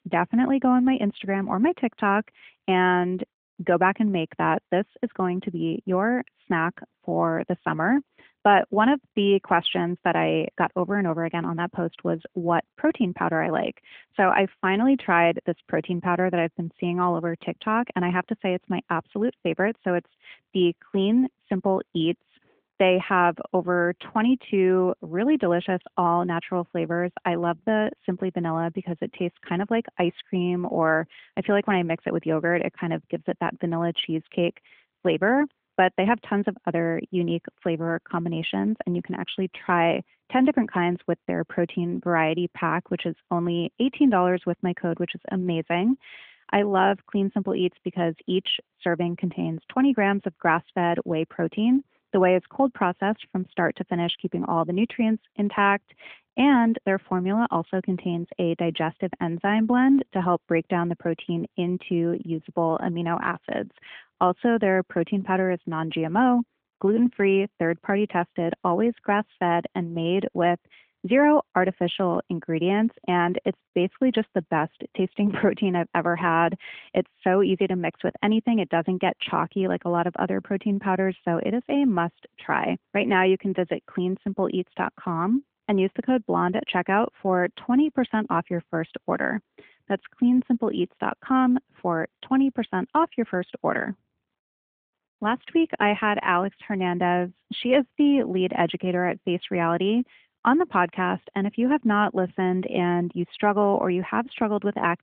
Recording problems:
phone-call audio; nothing above 3.5 kHz

